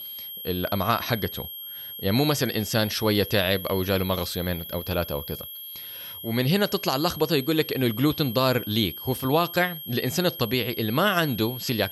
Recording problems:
high-pitched whine; noticeable; throughout; 3 kHz, 10 dB below the speech

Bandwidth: 18.5 kHz